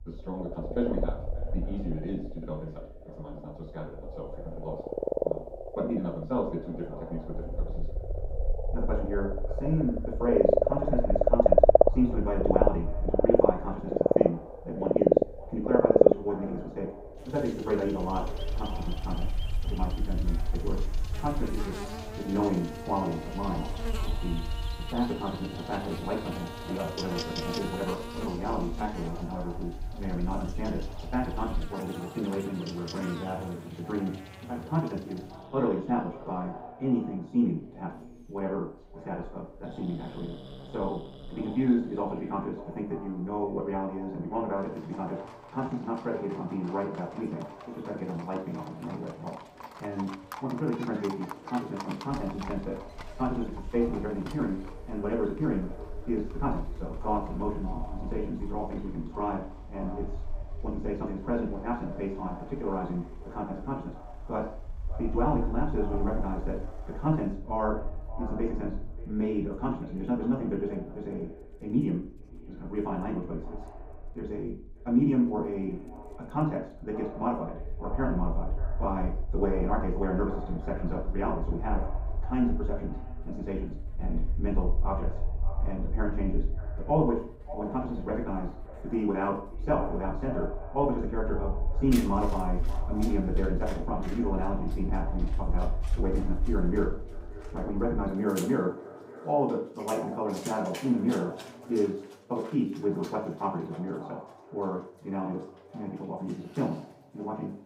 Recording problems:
off-mic speech; far
wrong speed, natural pitch; too fast; 1.7 times normal speed
echo of what is said; noticeable; throughout; 580 ms later, 15 dB below the speech
room echo; noticeable; dies away in 0.6 s
animal sounds; very loud; throughout; 1 dB above the speech
wind noise on the microphone; occasional gusts; until 32 s and from 52 s to 1:38; 25 dB below the speech

